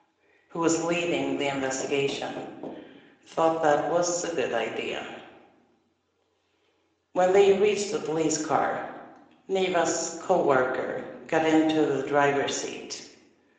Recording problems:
room echo; noticeable; dies away in 0.8 s
thin; somewhat; fading below 450 Hz
off-mic speech; somewhat distant
garbled, watery; slightly; nothing above 7.5 kHz
door banging; faint; from 1.5 to 3 s; peak 15 dB below the speech

